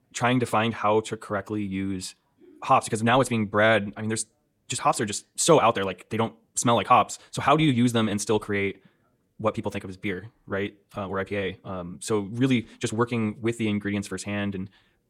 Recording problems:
wrong speed, natural pitch; too fast; 1.5 times normal speed

